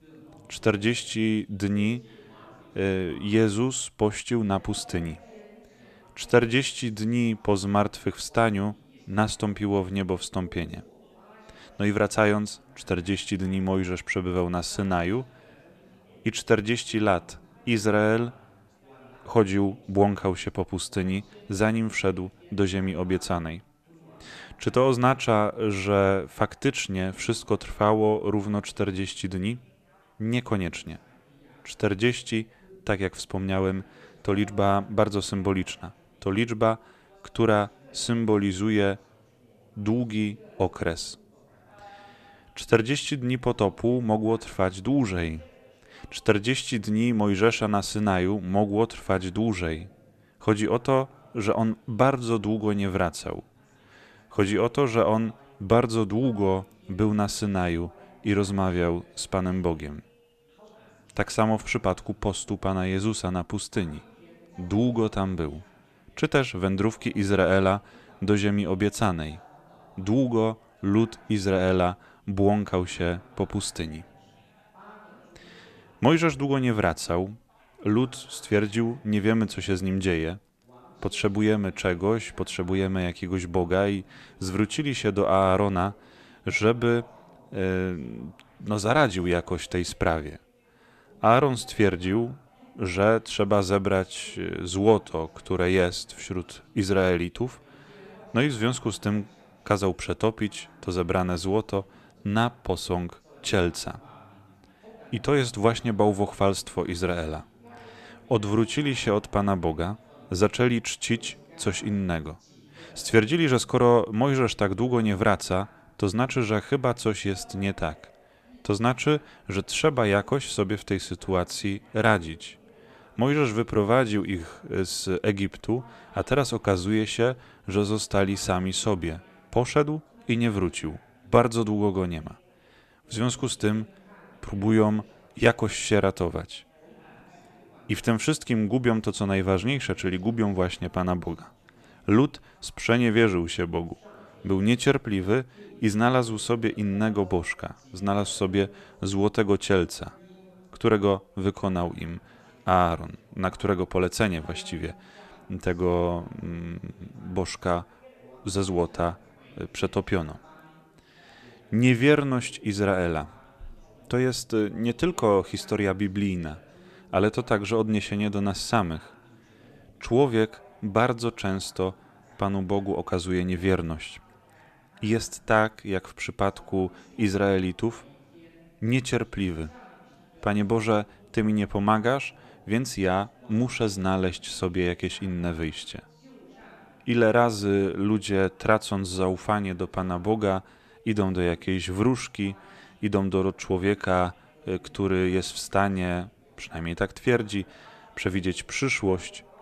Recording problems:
background chatter; faint; throughout; 3 voices, 30 dB below the speech

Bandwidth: 14.5 kHz